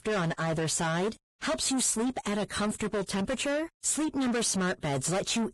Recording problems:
distortion; heavy; 7 dB below the speech
garbled, watery; badly; nothing above 10.5 kHz

